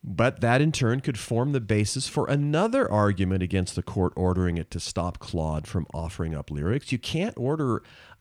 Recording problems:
none

